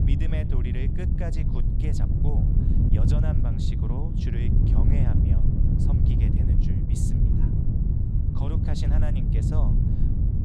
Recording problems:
wind noise on the microphone; heavy; 4 dB above the speech

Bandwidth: 15 kHz